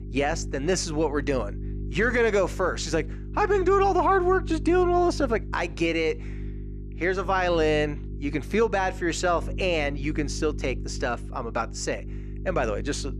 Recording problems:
electrical hum; faint; throughout; 50 Hz, 20 dB below the speech

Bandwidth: 14 kHz